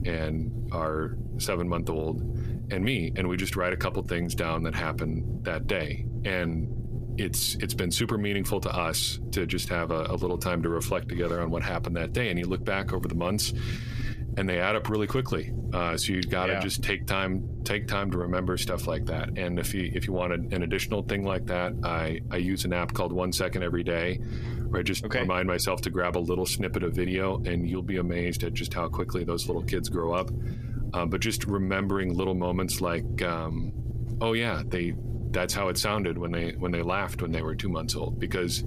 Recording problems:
squashed, flat; somewhat
low rumble; noticeable; throughout; 15 dB below the speech

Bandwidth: 14.5 kHz